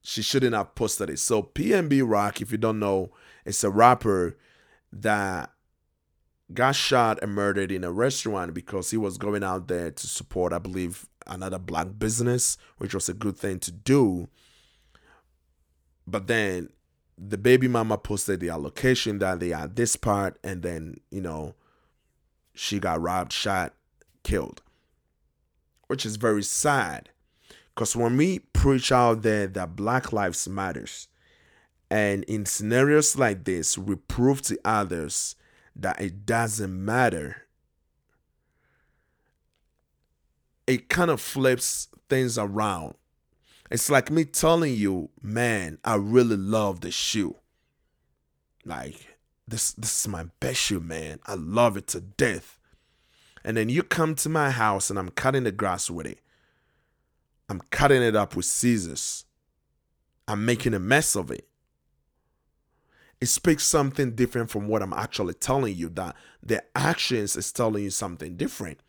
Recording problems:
none

